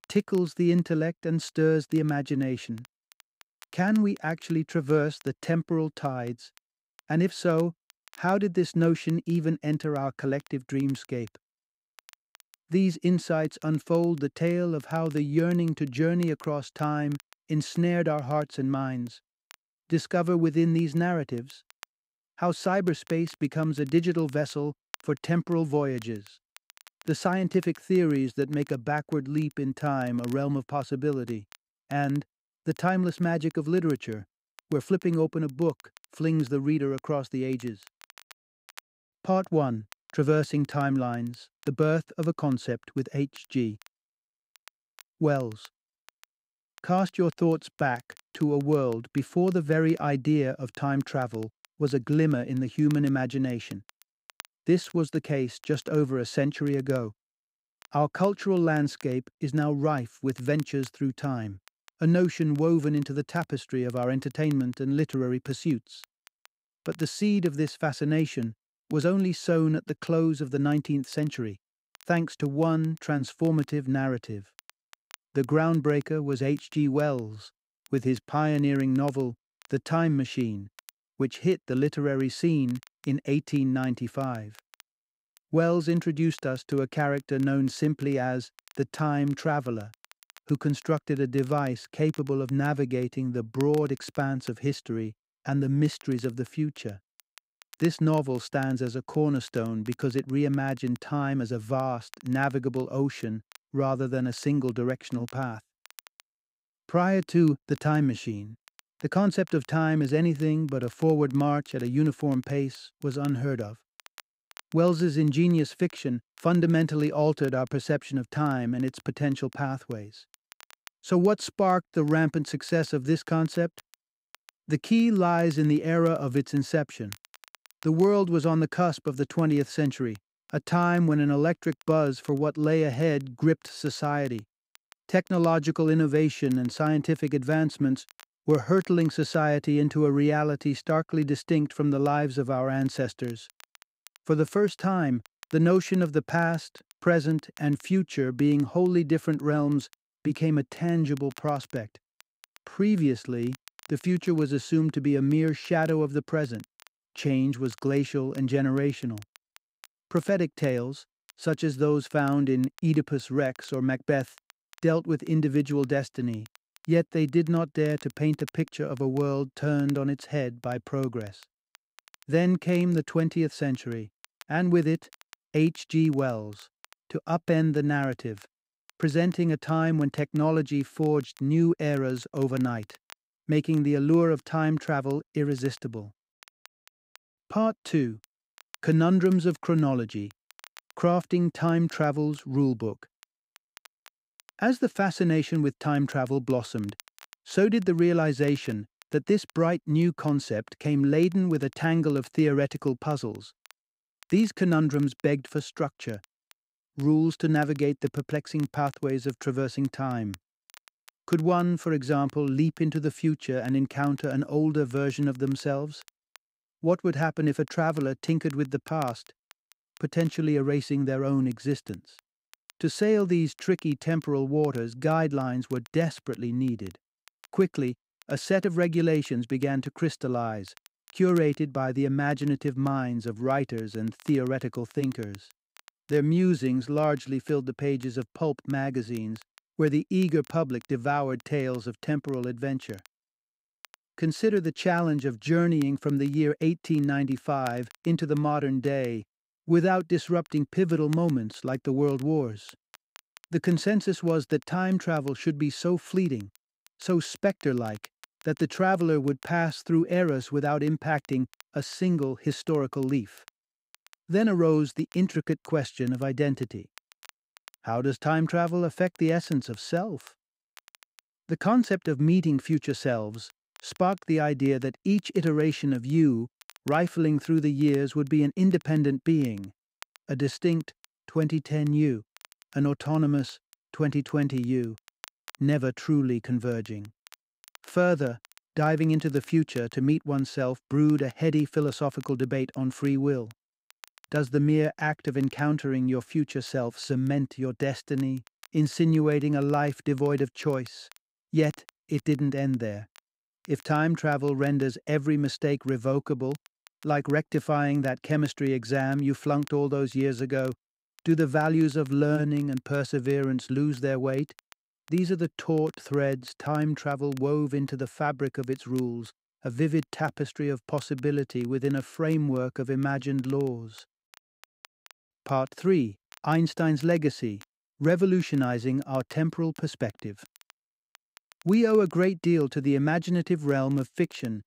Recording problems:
crackle, like an old record; faint; 30 dB below the speech

